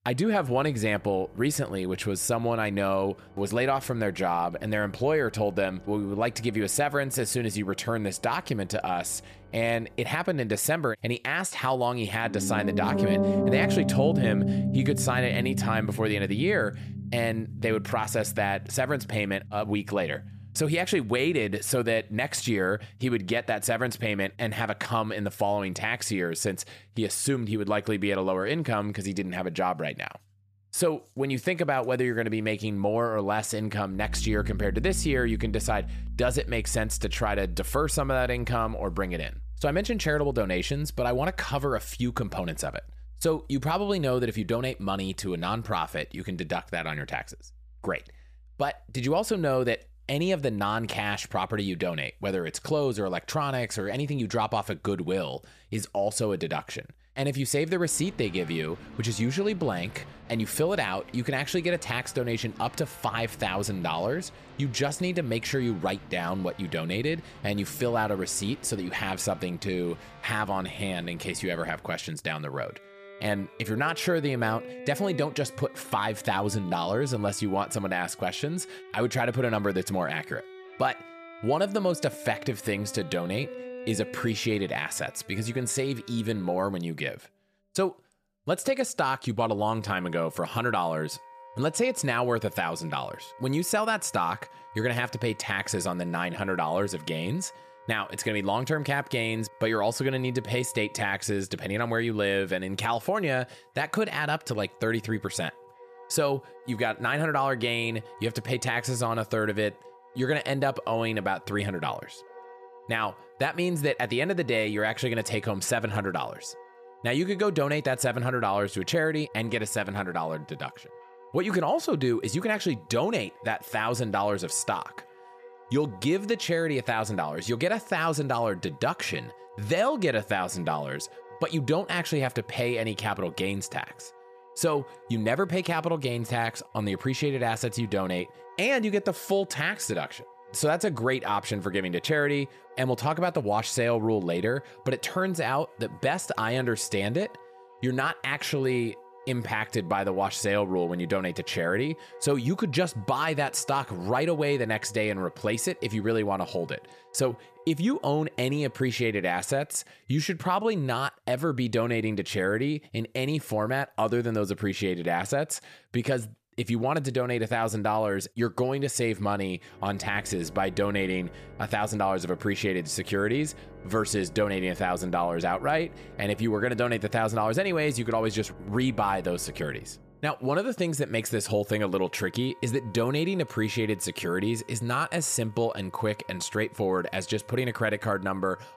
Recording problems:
background music; noticeable; throughout; 15 dB below the speech

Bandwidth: 14.5 kHz